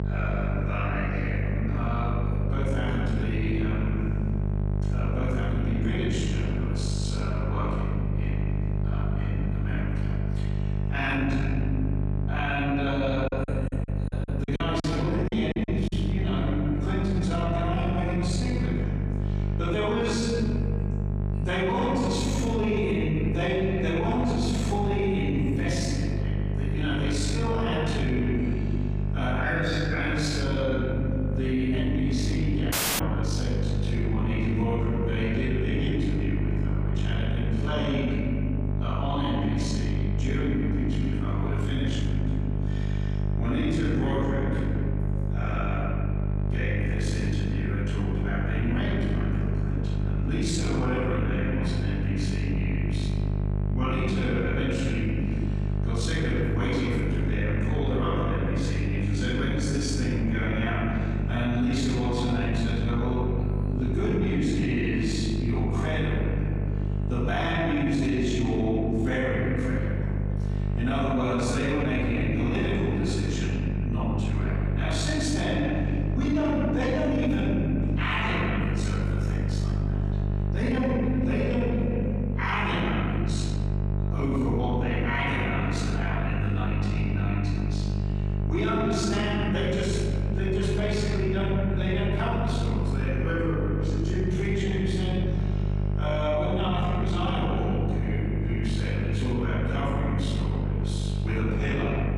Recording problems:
room echo; strong; dies away in 1.9 s
off-mic speech; far
squashed, flat; somewhat
electrical hum; loud; throughout; 50 Hz, 9 dB below the speech
choppy; very; from 13 to 16 s; 18% of the speech affected
audio cutting out; at 33 s

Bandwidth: 15 kHz